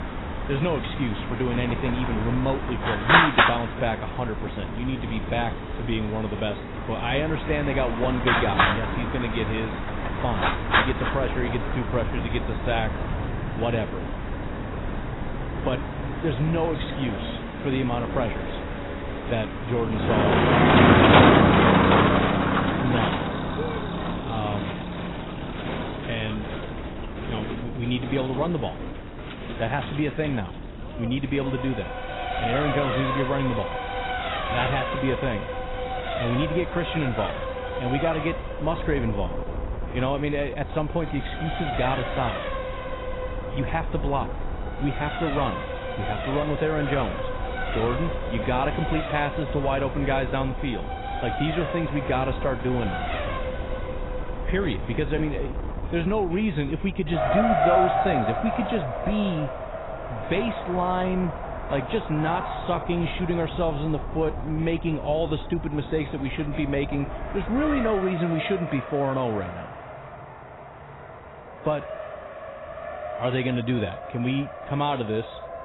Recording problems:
garbled, watery; badly; nothing above 4 kHz
traffic noise; very loud; throughout; 1 dB above the speech
wind noise on the microphone; occasional gusts; until 1:08; 15 dB below the speech

